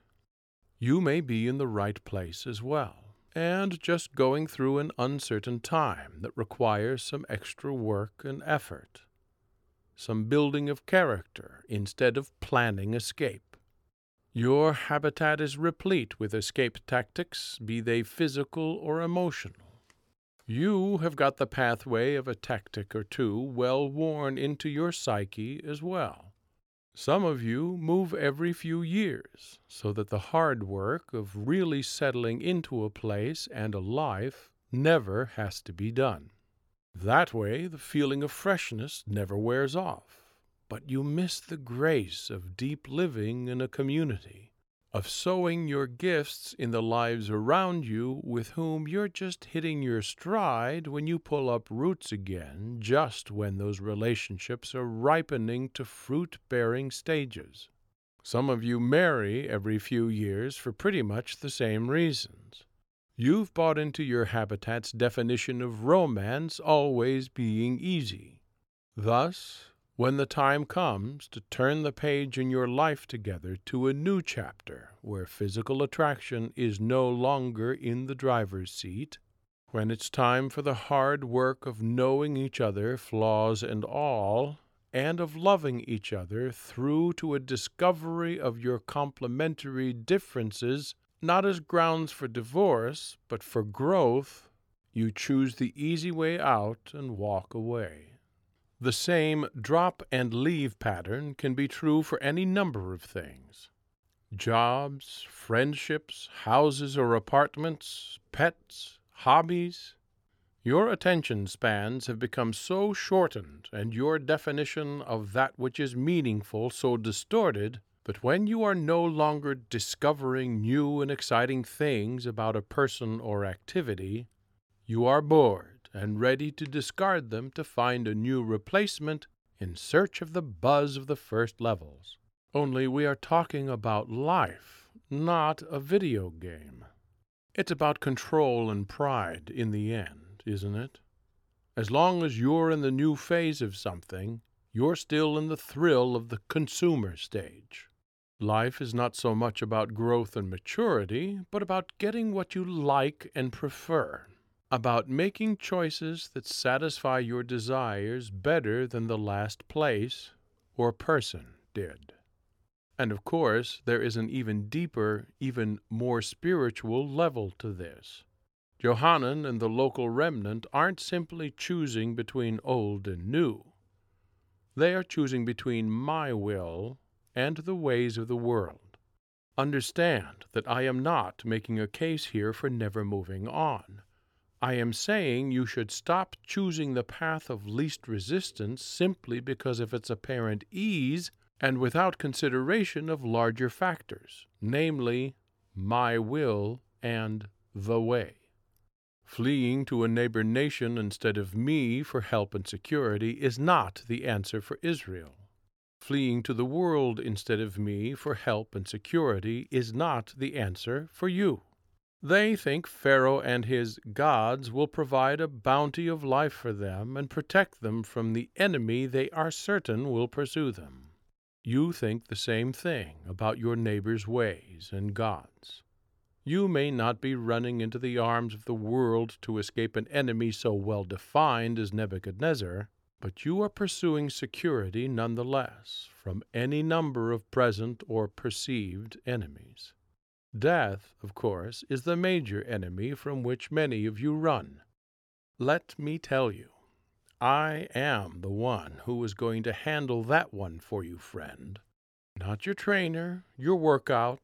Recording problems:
none

